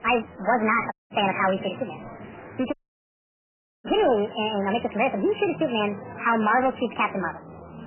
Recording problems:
garbled, watery; badly; nothing above 3 kHz
wrong speed and pitch; too fast and too high; 1.5 times normal speed
distortion; slight; 5% of the sound clipped
murmuring crowd; noticeable; throughout; 15 dB below the speech
audio cutting out; at 1 s and at 2.5 s for 1 s

